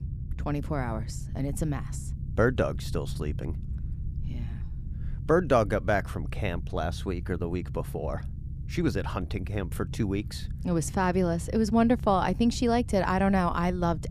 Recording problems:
low rumble; faint; throughout; 20 dB below the speech

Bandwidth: 14.5 kHz